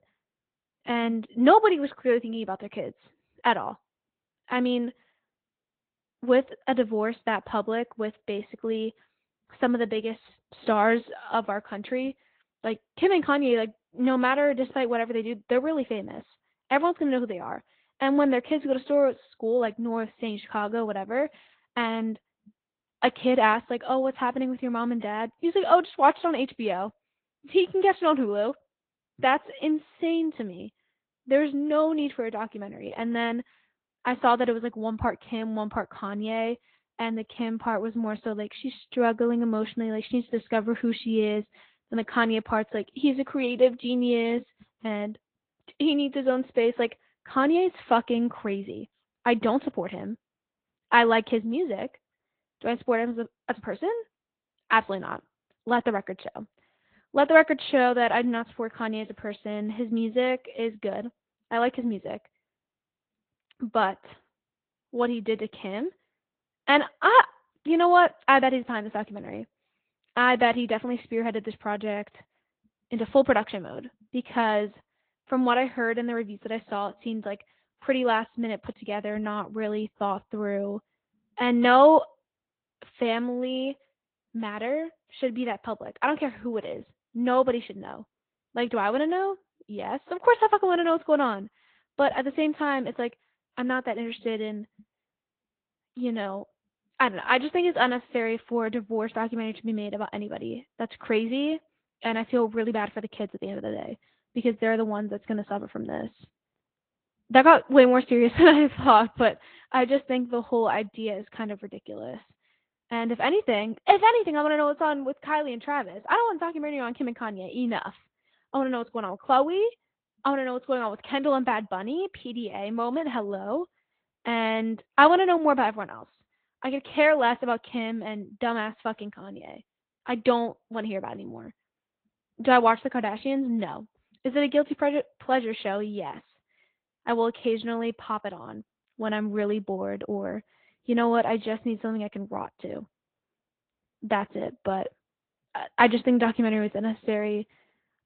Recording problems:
high frequencies cut off; severe; nothing above 4 kHz
garbled, watery; slightly

